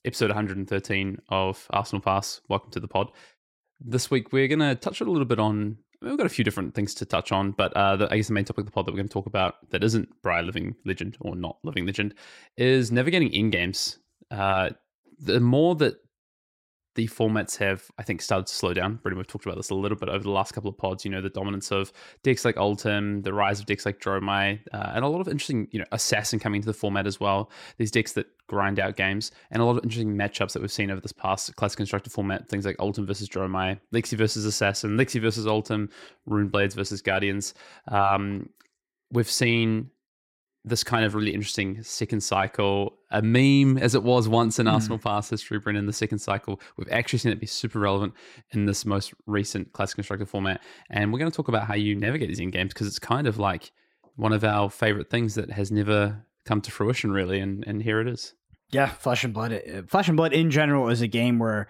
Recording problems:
none

